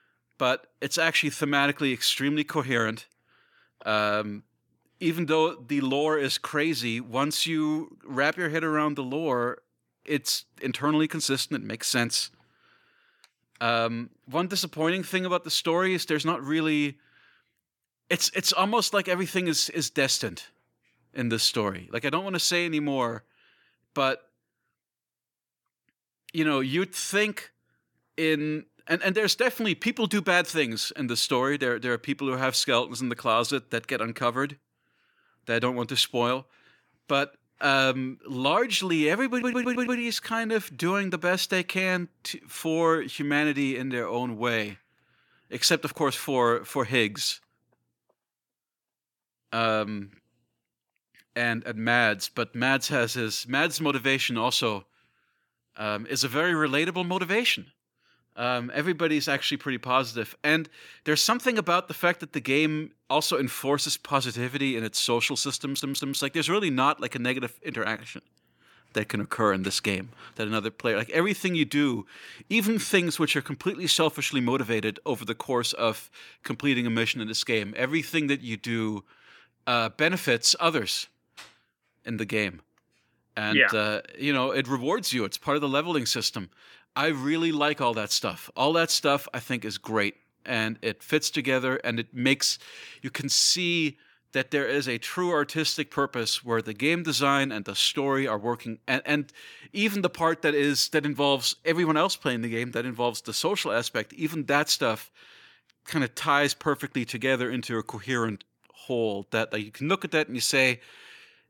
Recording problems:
audio stuttering; at 39 s and at 1:06

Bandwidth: 18 kHz